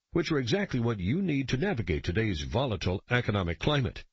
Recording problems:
garbled, watery; slightly; nothing above 7.5 kHz

